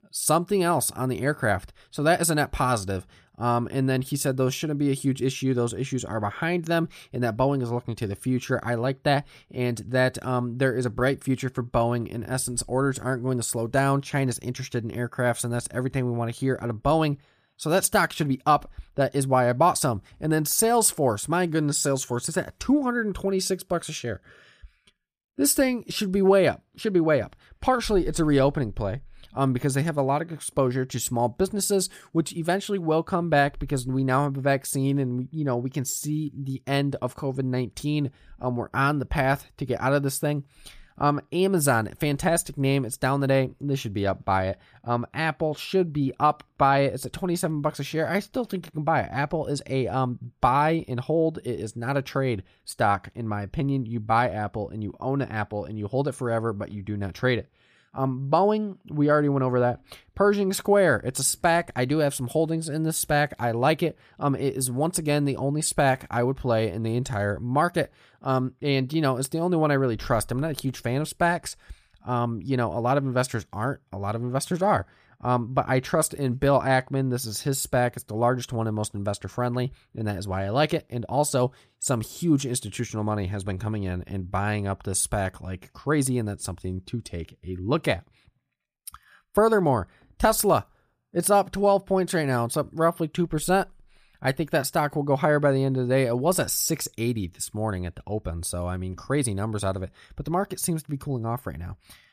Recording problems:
none

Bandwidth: 15 kHz